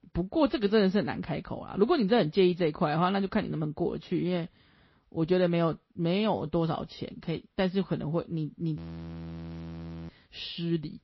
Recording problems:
garbled, watery; slightly
audio freezing; at 9 s for 1.5 s

